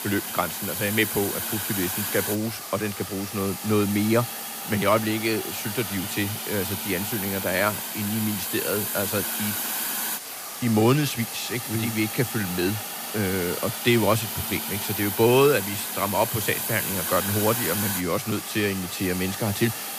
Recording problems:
hiss; loud; throughout; 3 dB below the speech

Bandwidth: 15 kHz